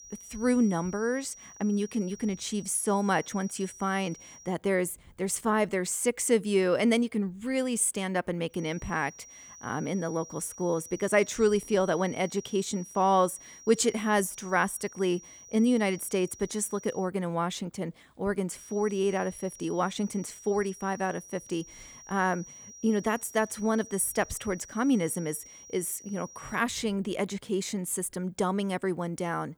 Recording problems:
high-pitched whine; noticeable; until 4.5 s, from 8.5 to 17 s and from 19 to 27 s; 6 kHz, 20 dB below the speech

